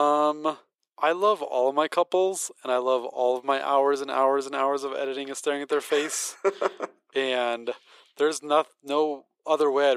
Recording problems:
thin; very; fading below 400 Hz
abrupt cut into speech; at the start and the end

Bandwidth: 15 kHz